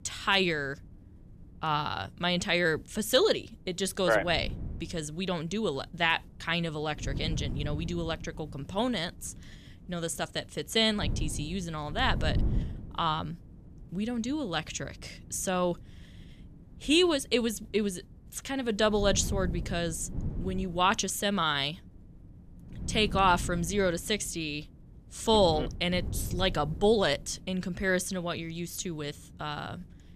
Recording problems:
wind noise on the microphone; occasional gusts; 20 dB below the speech

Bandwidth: 14.5 kHz